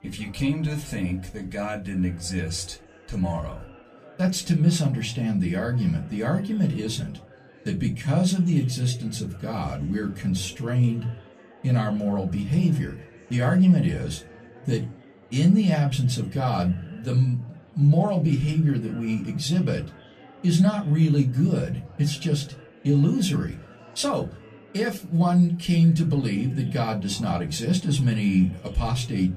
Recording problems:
off-mic speech; far
room echo; very slight; dies away in 0.2 s
chatter from many people; faint; throughout; 25 dB below the speech

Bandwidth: 14.5 kHz